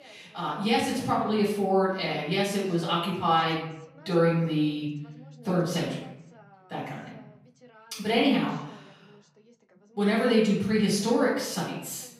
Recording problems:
off-mic speech; far
room echo; noticeable; dies away in 0.7 s
voice in the background; faint; throughout; 30 dB below the speech

